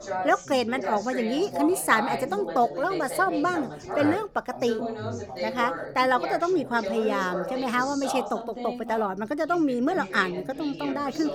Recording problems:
background chatter; loud; throughout; 2 voices, 7 dB below the speech

